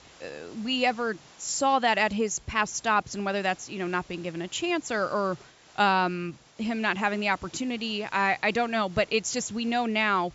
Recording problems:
high frequencies cut off; noticeable; nothing above 7.5 kHz
hiss; faint; throughout; 25 dB below the speech

